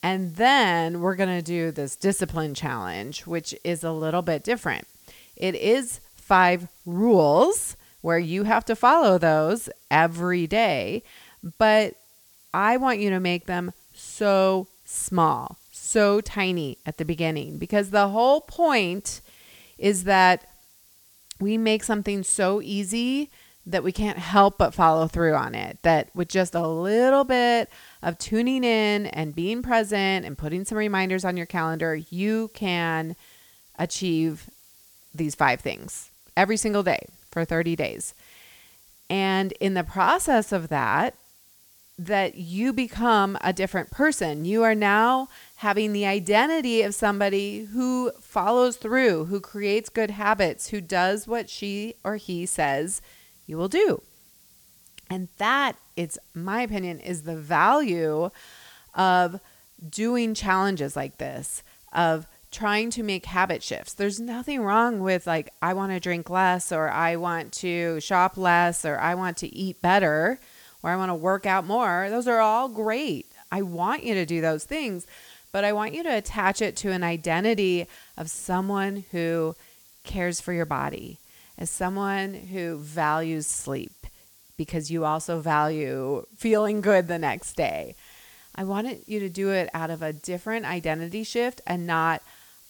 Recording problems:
hiss; faint; throughout; 25 dB below the speech

